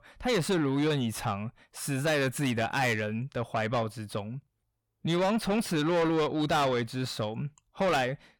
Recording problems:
distortion; heavy; 8 dB below the speech

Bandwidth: 18 kHz